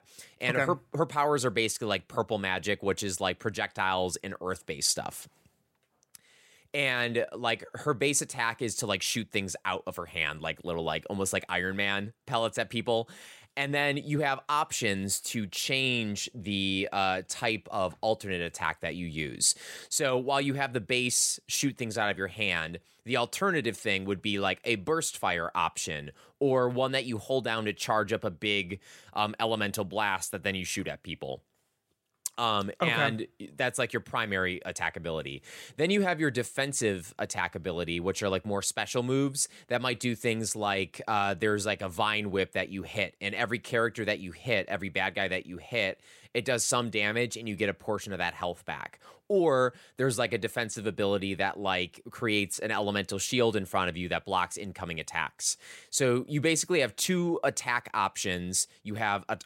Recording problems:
none

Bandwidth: 16 kHz